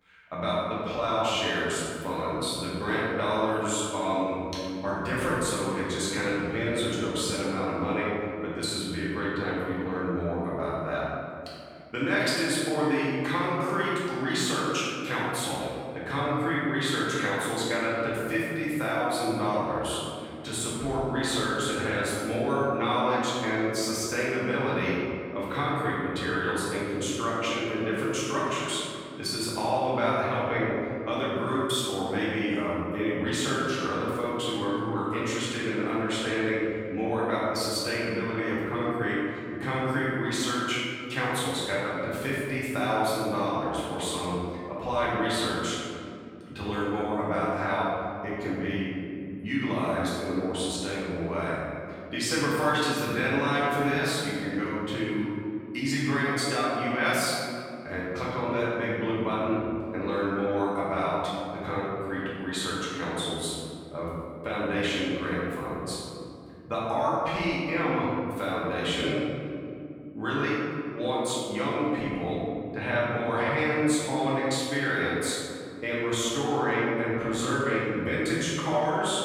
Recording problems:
room echo; strong; dies away in 2.5 s
off-mic speech; far

